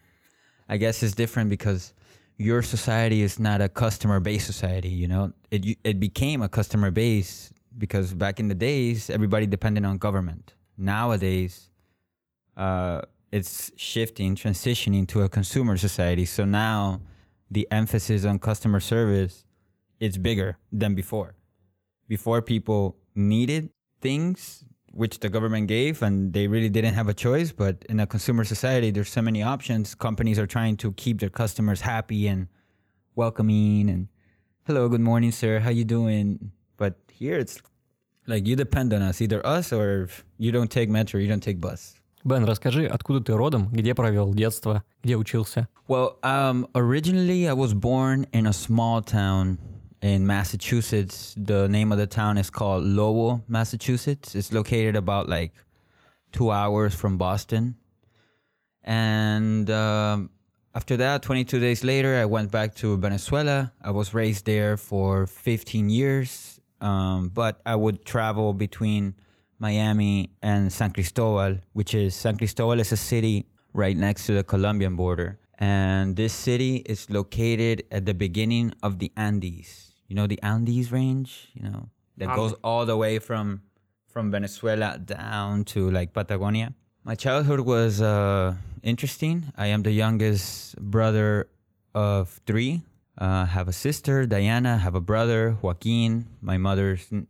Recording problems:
none

